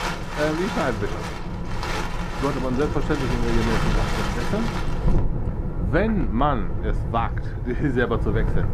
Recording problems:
muffled; slightly; fading above 2.5 kHz
wind in the background; loud; throughout; 1 dB below the speech

